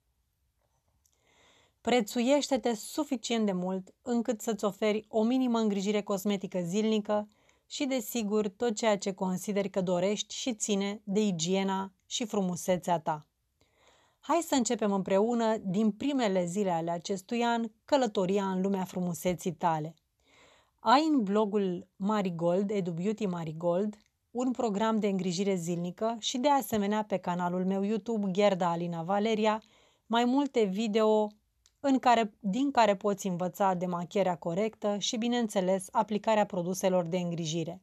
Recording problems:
none

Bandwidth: 13.5 kHz